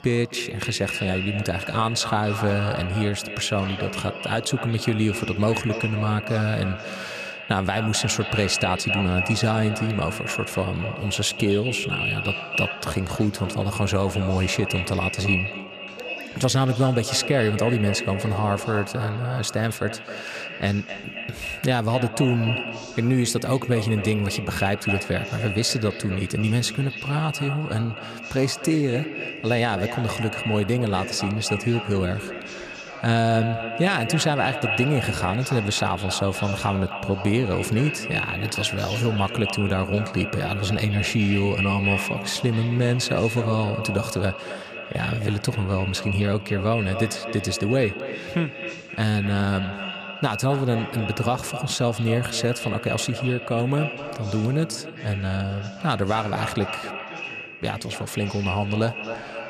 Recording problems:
echo of what is said; strong; throughout; 260 ms later, 6 dB below the speech
voice in the background; noticeable; throughout; 20 dB below the speech

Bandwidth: 14.5 kHz